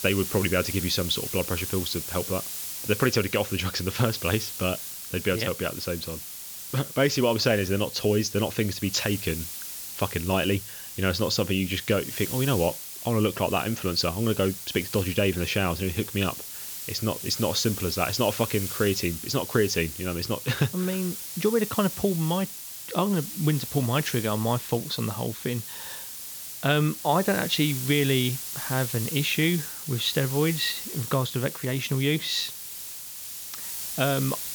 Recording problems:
high frequencies cut off; noticeable; nothing above 7.5 kHz
hiss; loud; throughout; 7 dB below the speech

